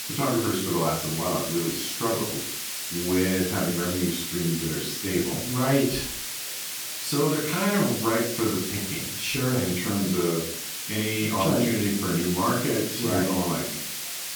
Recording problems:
off-mic speech; far
room echo; noticeable; dies away in 0.4 s
hiss; loud; throughout; 4 dB below the speech
chatter from many people; faint; throughout; 30 dB below the speech

